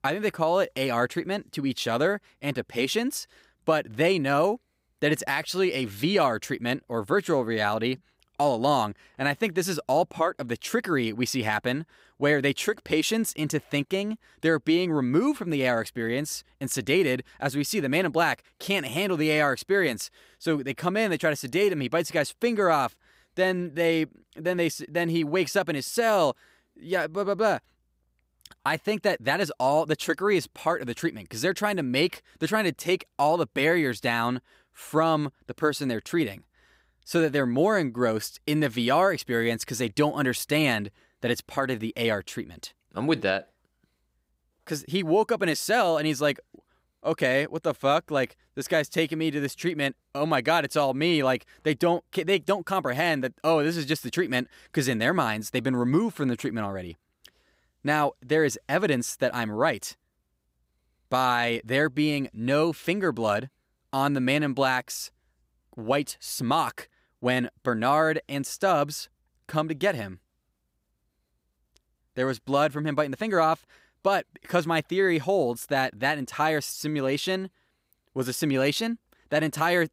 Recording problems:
none

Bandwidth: 15.5 kHz